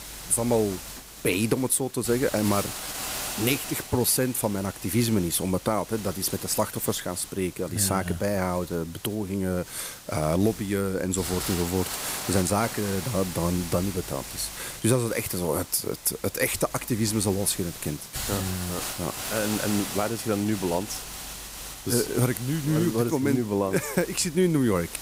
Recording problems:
hiss; loud; throughout; 9 dB below the speech

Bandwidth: 15.5 kHz